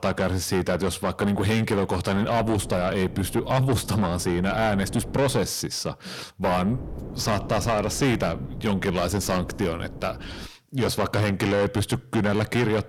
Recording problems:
distortion; heavy; 6 dB below the speech
wind noise on the microphone; occasional gusts; from 2 to 5.5 s and from 6.5 to 10 s; 20 dB below the speech

